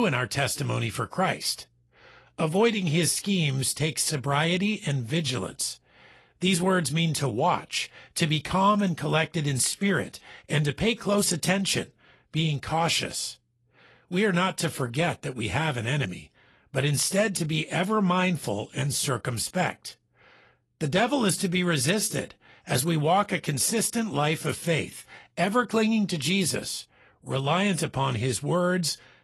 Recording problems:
garbled, watery; slightly; nothing above 11.5 kHz
abrupt cut into speech; at the start

